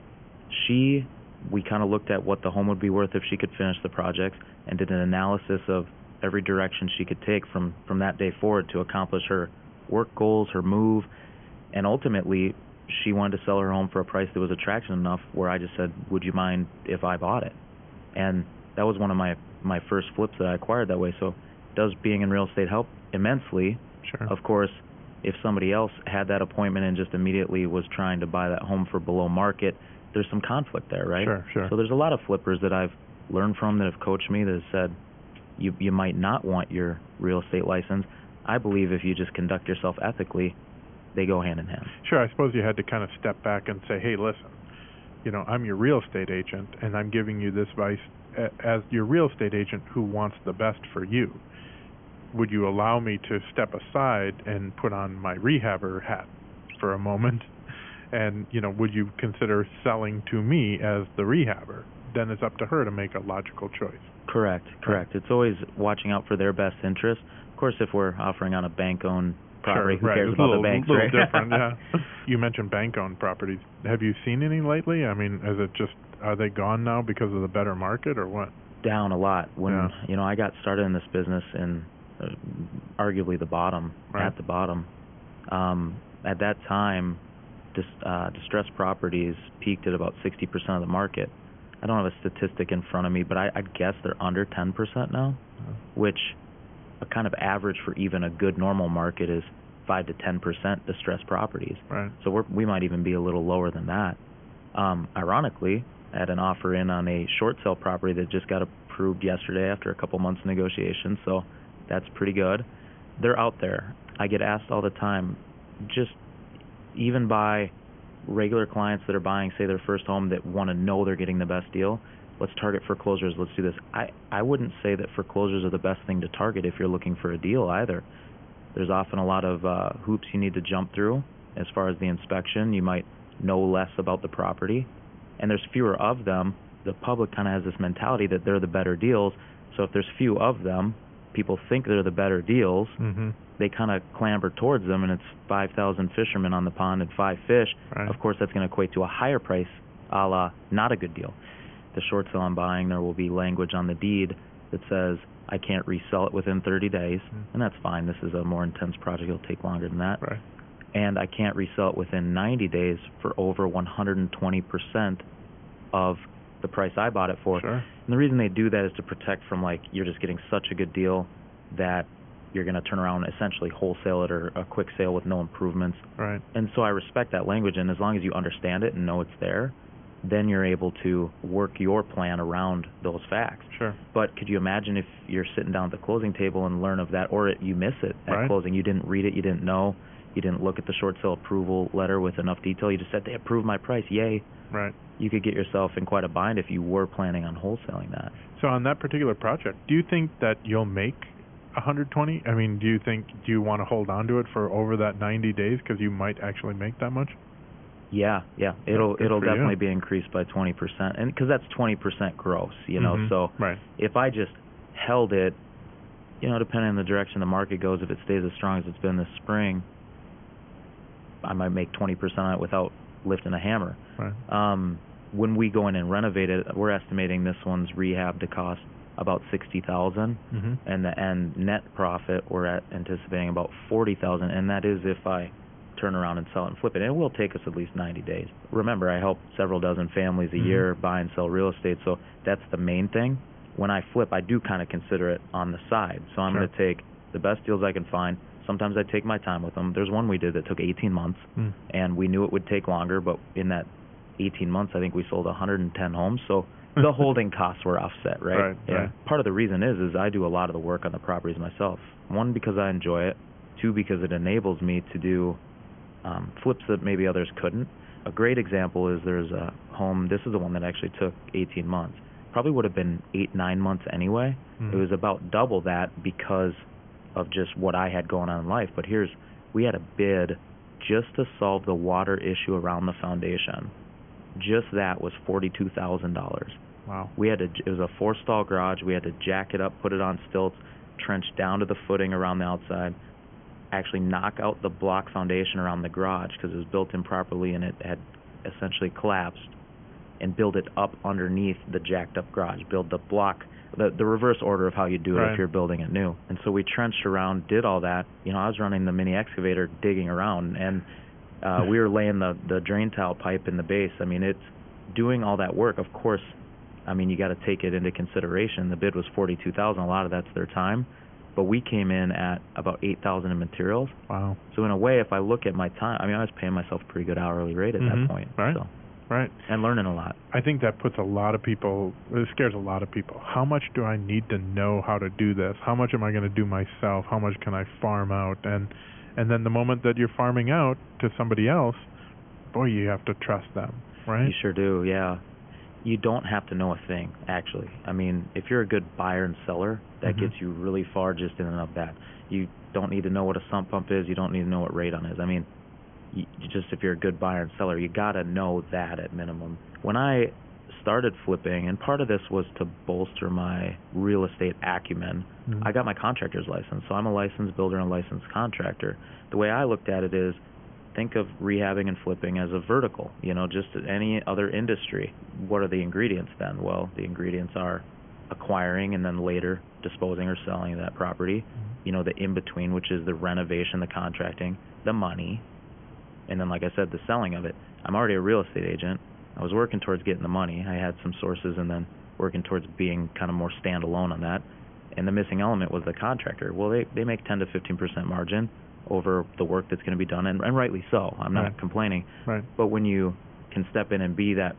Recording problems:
high frequencies cut off; severe; nothing above 3.5 kHz
hiss; faint; throughout; 20 dB below the speech

